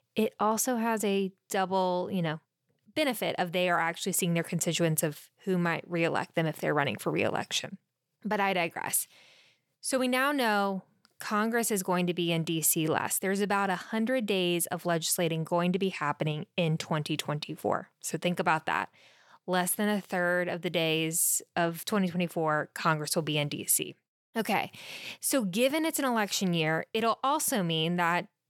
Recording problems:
none

